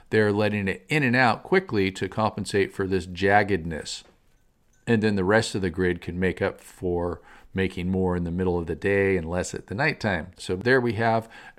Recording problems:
none

